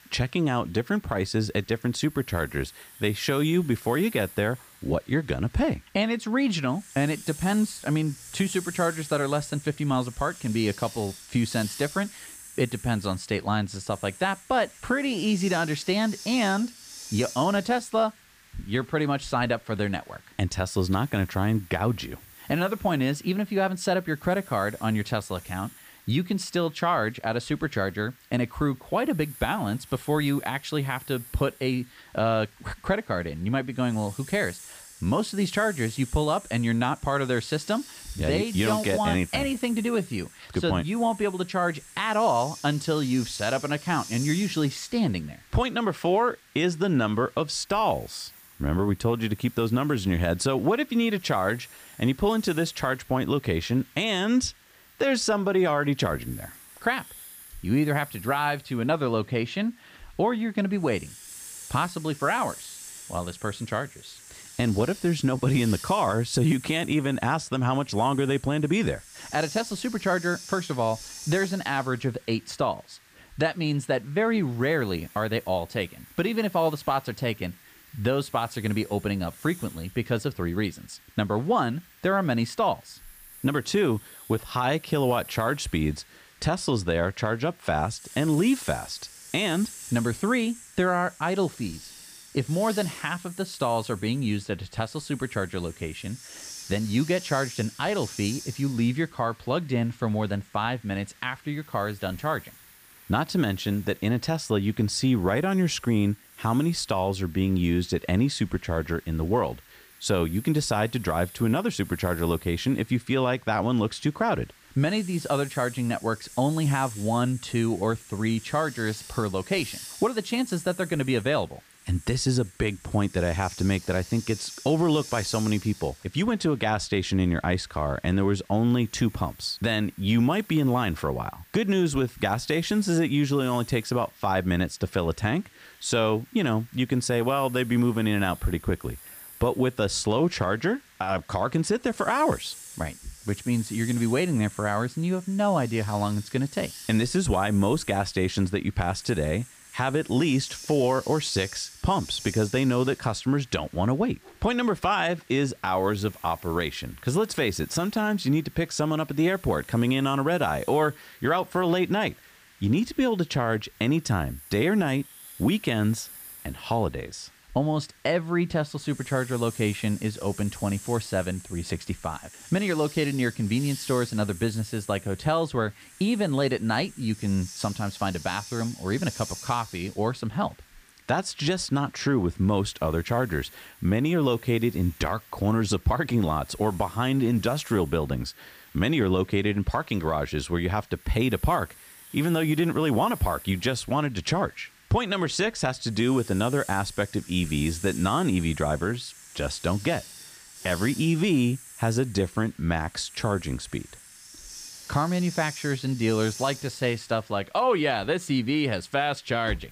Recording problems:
hiss; noticeable; throughout; 15 dB below the speech

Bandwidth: 15 kHz